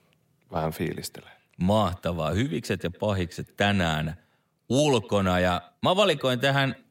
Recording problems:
echo of what is said; faint; throughout; 100 ms later, 25 dB below the speech

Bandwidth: 16 kHz